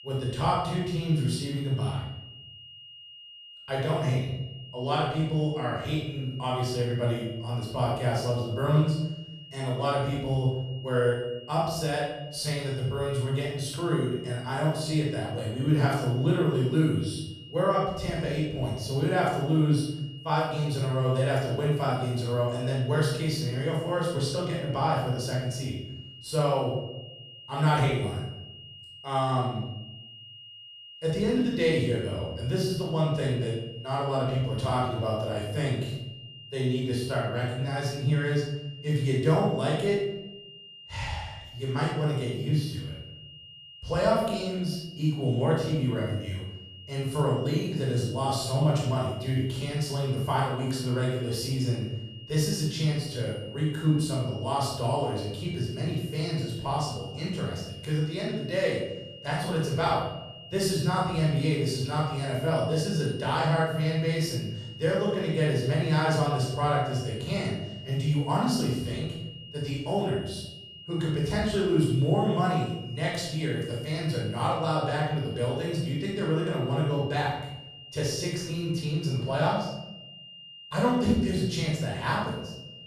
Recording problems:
room echo; strong; dies away in 0.9 s
off-mic speech; far
high-pitched whine; noticeable; throughout; 3 kHz, 15 dB below the speech

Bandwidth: 14 kHz